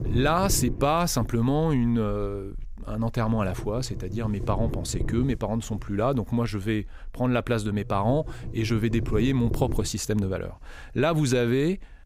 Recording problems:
low rumble; noticeable; throughout; 15 dB below the speech

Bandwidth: 15.5 kHz